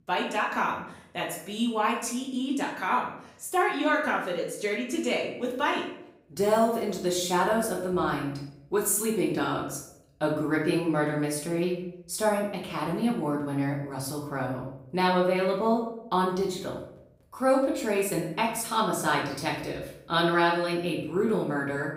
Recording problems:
off-mic speech; far
room echo; noticeable; dies away in 0.6 s

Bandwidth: 15.5 kHz